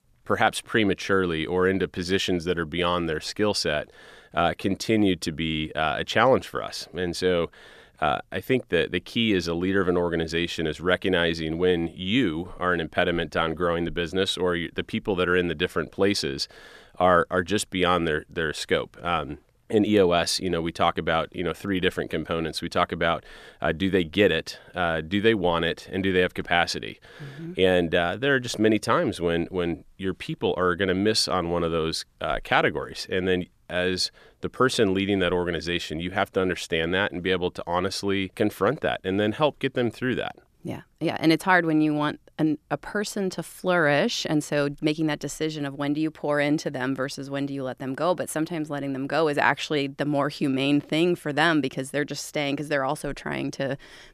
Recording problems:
none

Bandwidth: 14.5 kHz